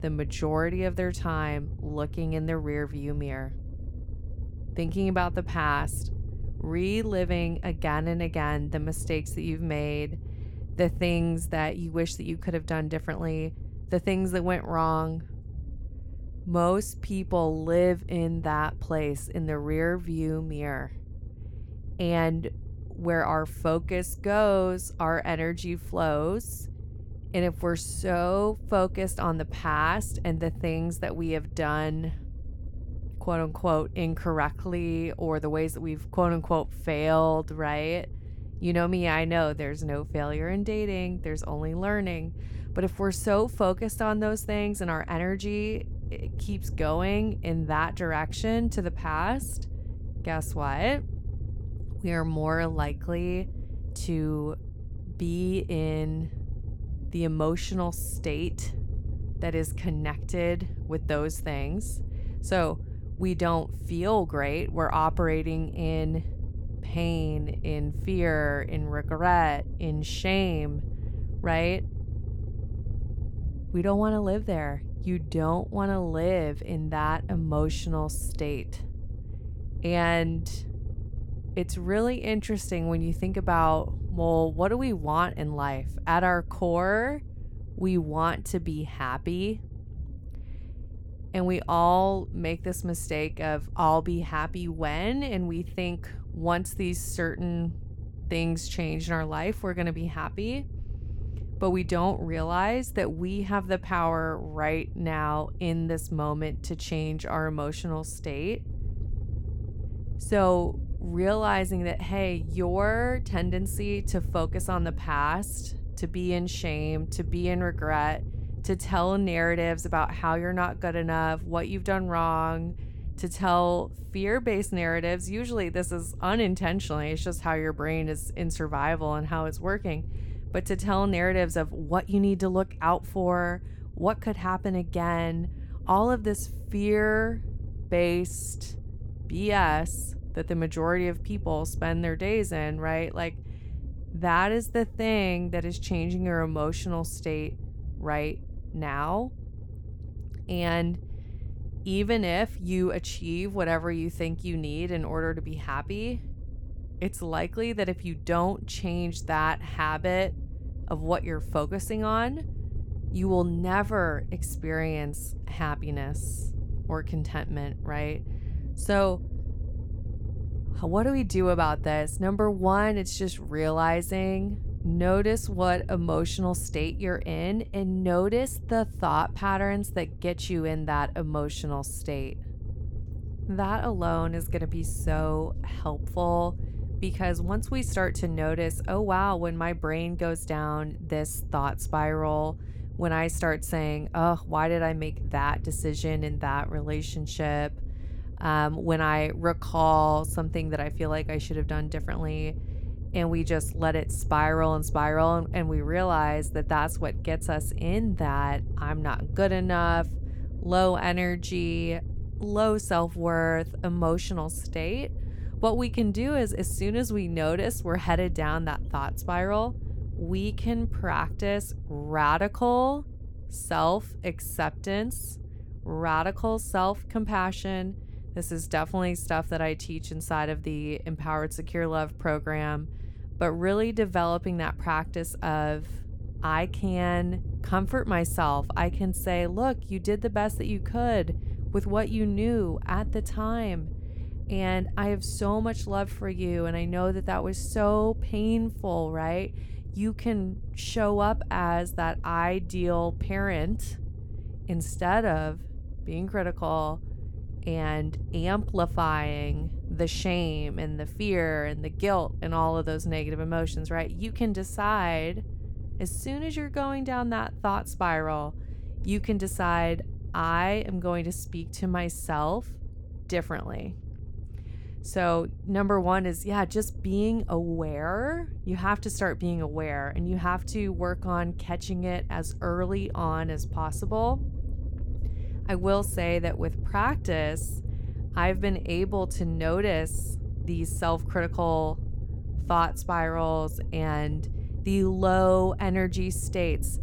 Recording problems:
low rumble; faint; throughout; 20 dB below the speech

